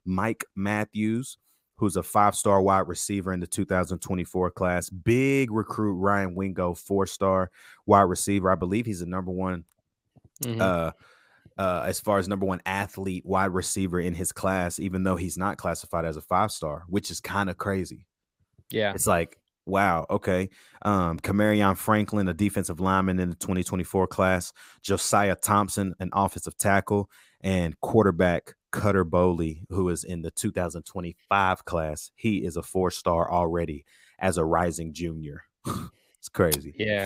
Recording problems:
abrupt cut into speech; at the end

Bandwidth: 15.5 kHz